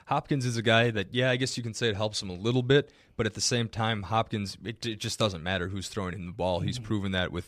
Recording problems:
none

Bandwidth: 14.5 kHz